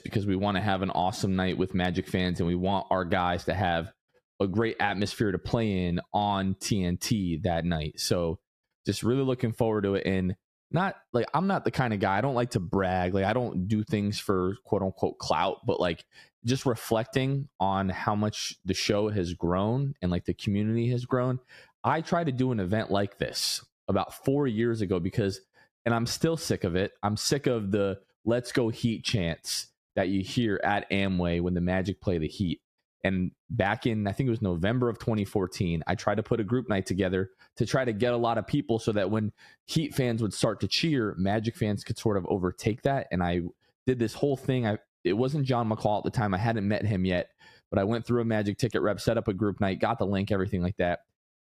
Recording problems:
squashed, flat; somewhat

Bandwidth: 14.5 kHz